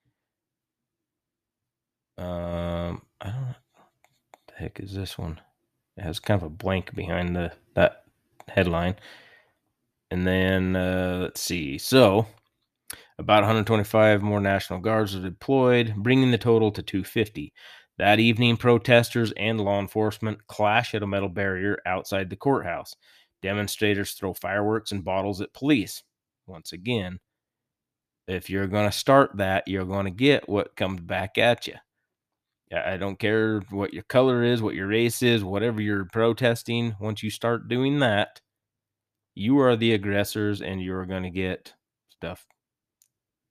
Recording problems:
none

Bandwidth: 14.5 kHz